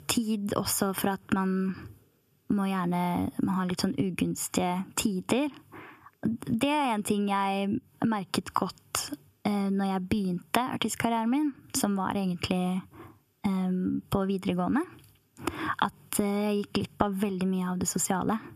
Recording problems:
squashed, flat; heavily

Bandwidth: 14.5 kHz